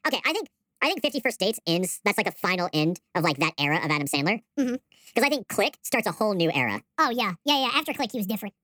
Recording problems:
wrong speed and pitch; too fast and too high; 1.5 times normal speed

